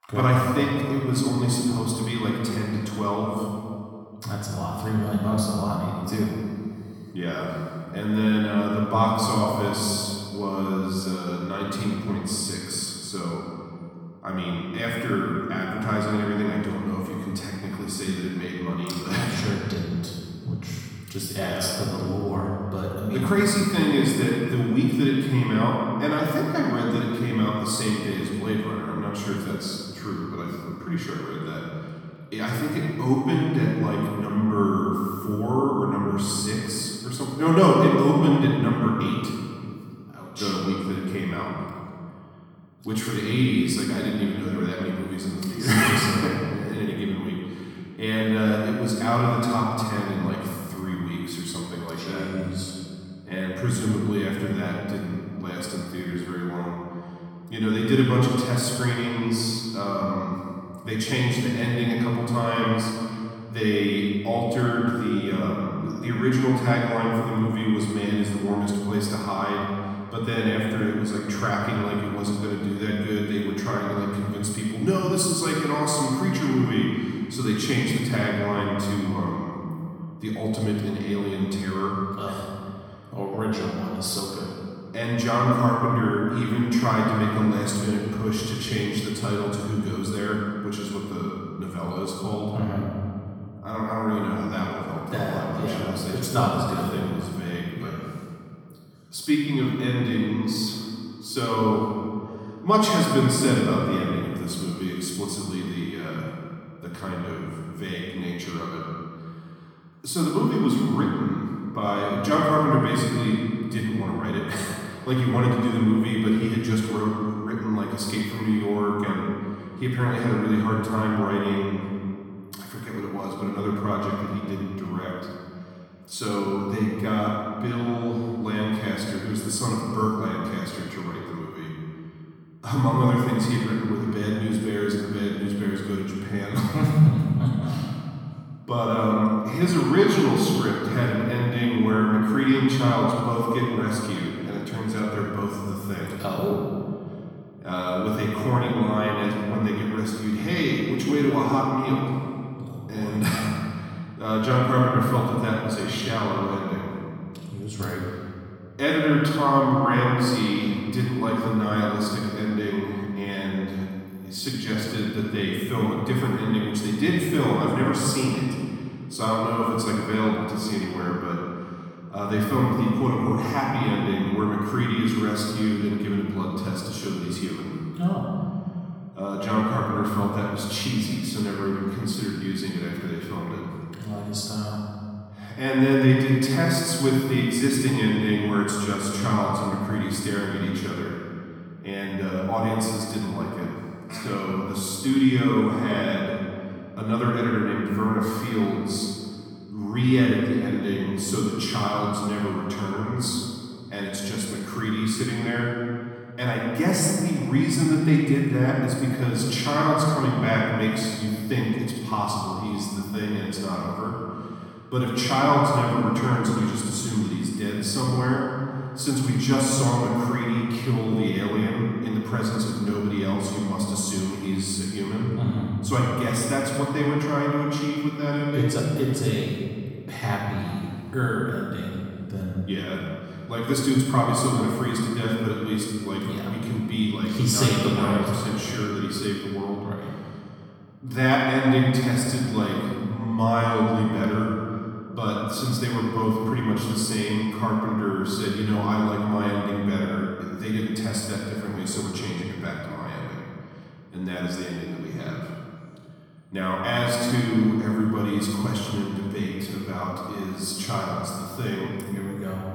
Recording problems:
room echo; strong; dies away in 2.2 s
off-mic speech; far

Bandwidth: 18 kHz